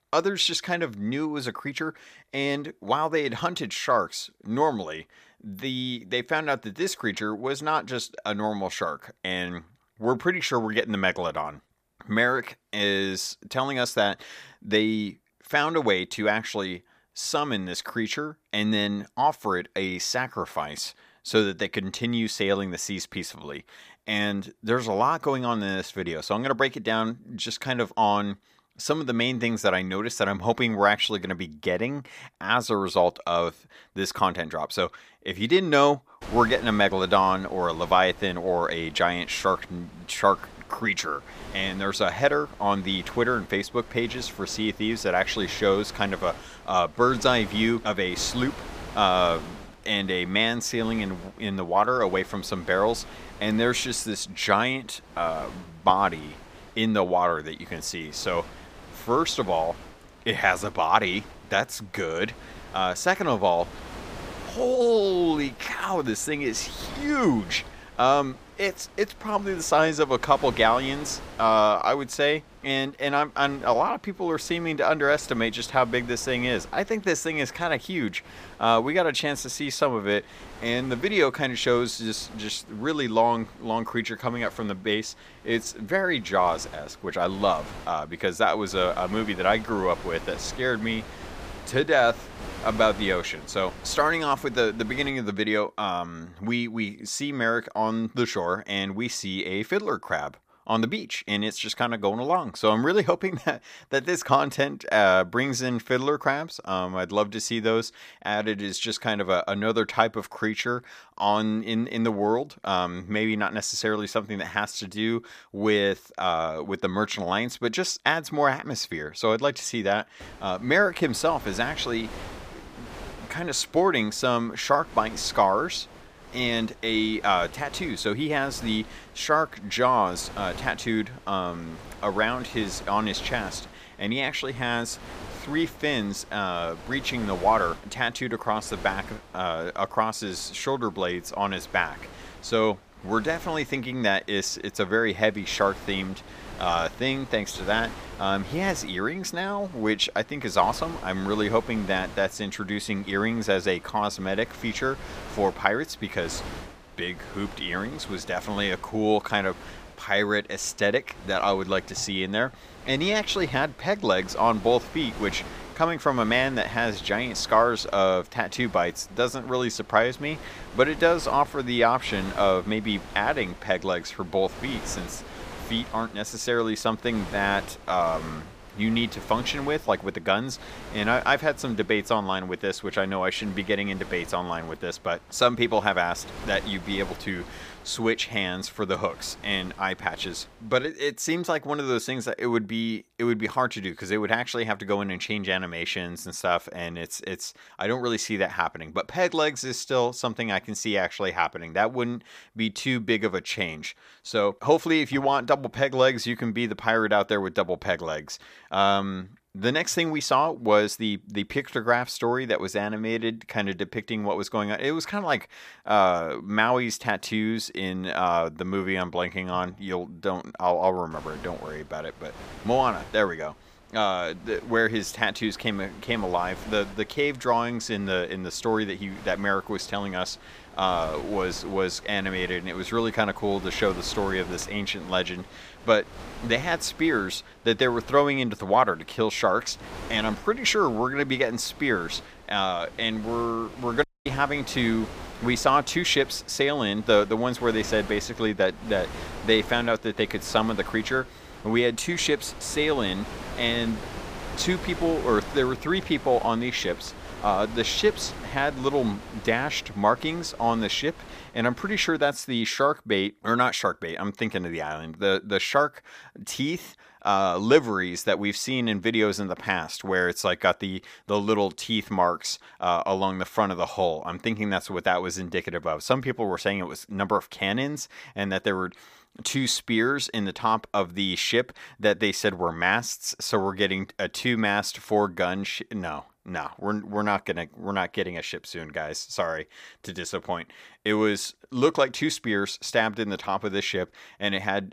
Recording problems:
wind noise on the microphone; occasional gusts; from 36 s to 1:35, from 2:00 to 3:11 and from 3:41 to 4:22; 20 dB below the speech
audio cutting out; at 4:04

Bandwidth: 15 kHz